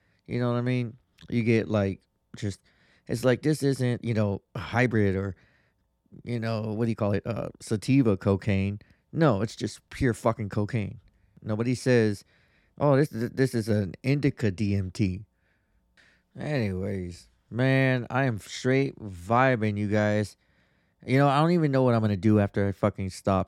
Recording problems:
uneven, jittery; strongly; from 1 to 21 s

